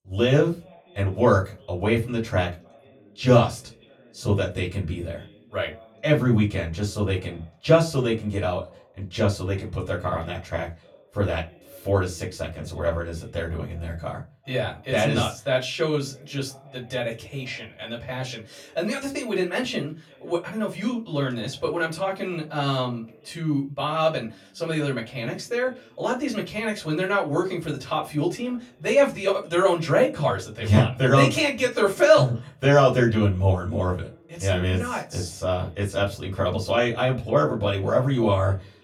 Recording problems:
off-mic speech; far
room echo; very slight; dies away in 0.2 s
voice in the background; faint; throughout; 30 dB below the speech

